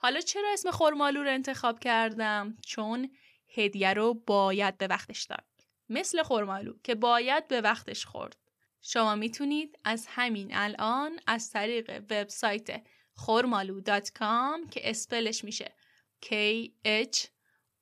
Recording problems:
uneven, jittery; strongly; from 0.5 to 15 s

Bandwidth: 14.5 kHz